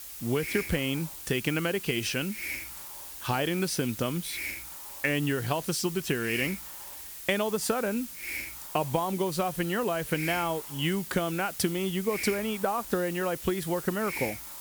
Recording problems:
hiss; loud; throughout; 7 dB below the speech

